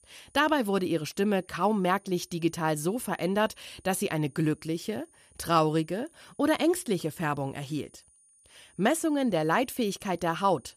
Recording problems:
high-pitched whine; faint; throughout; 9.5 kHz, 30 dB below the speech

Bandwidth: 14.5 kHz